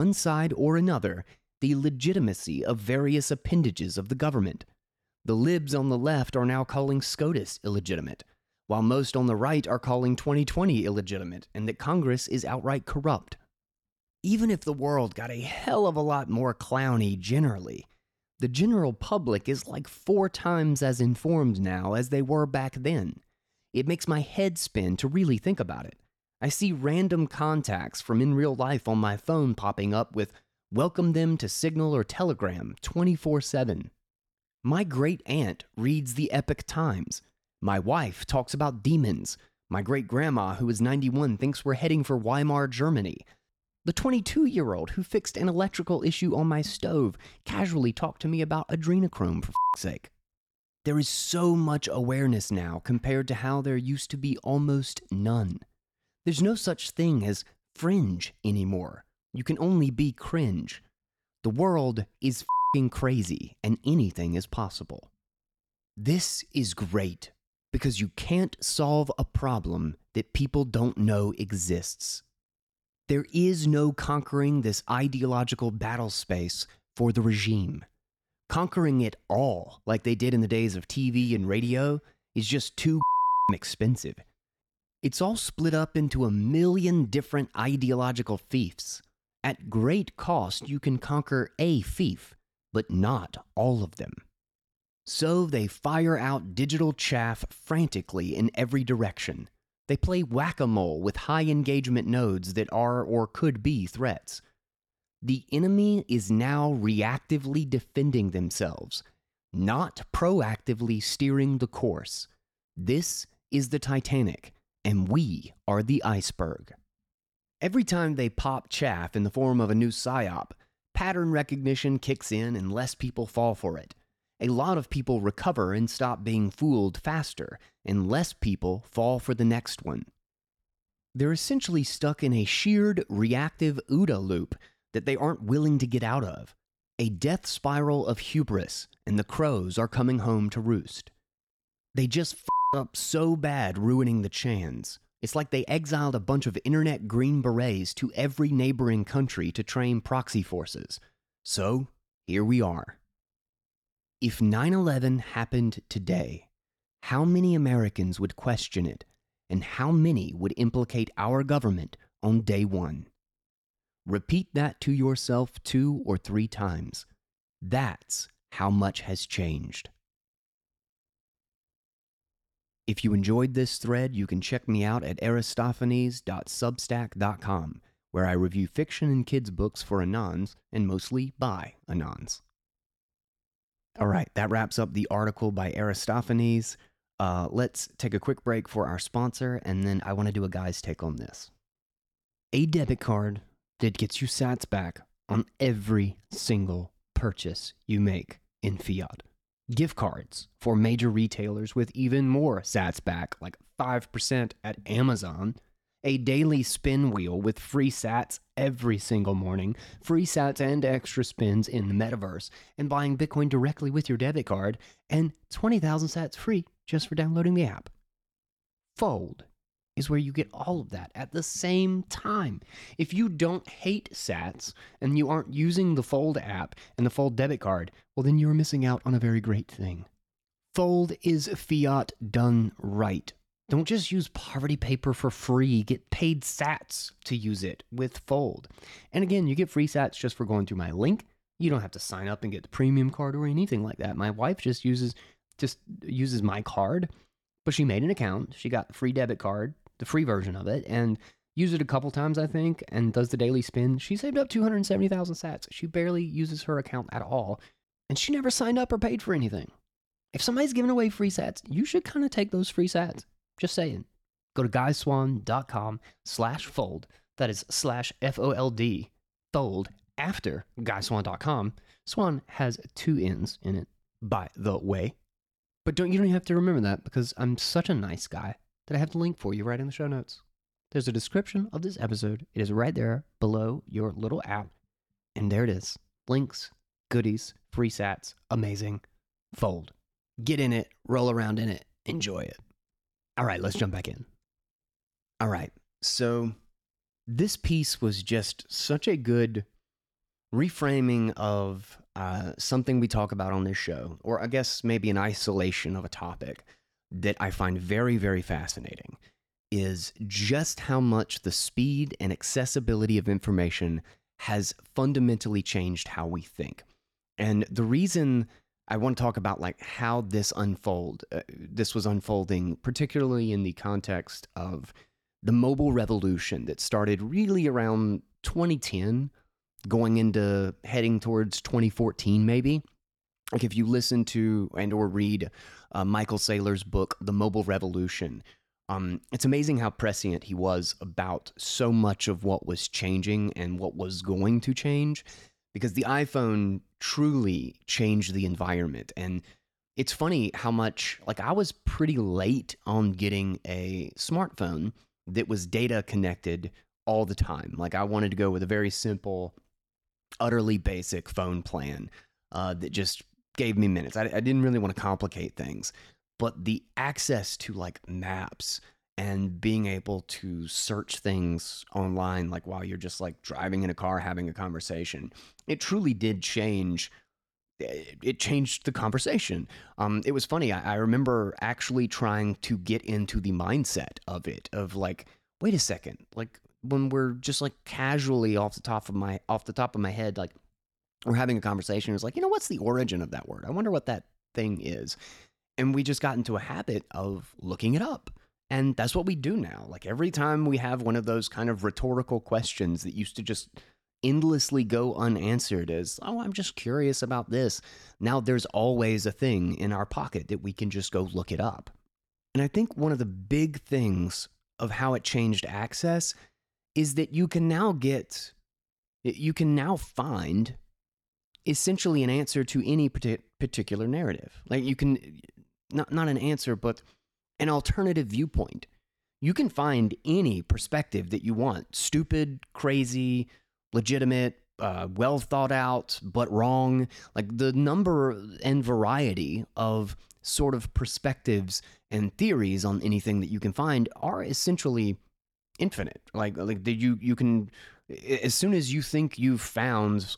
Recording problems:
abrupt cut into speech; at the start

